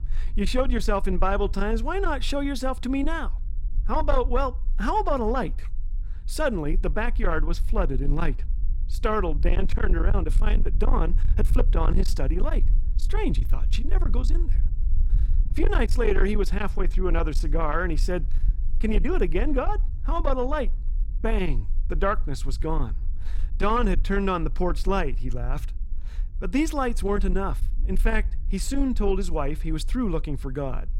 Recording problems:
distortion; slight; 10 dB below the speech
low rumble; noticeable; throughout; 15 dB below the speech

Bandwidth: 16 kHz